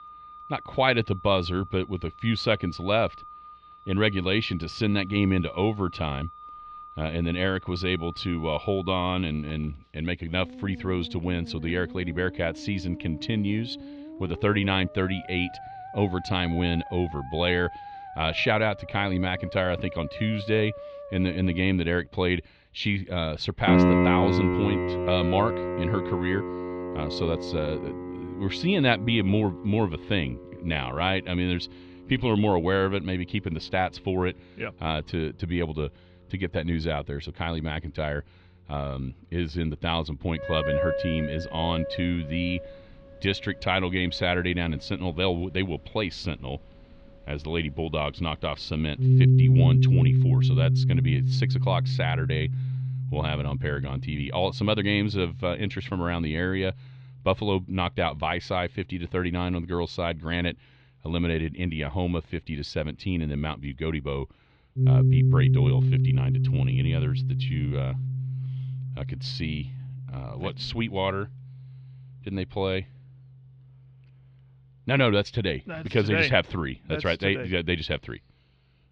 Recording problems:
muffled; slightly; fading above 3.5 kHz
background music; very loud; throughout; 1 dB above the speech

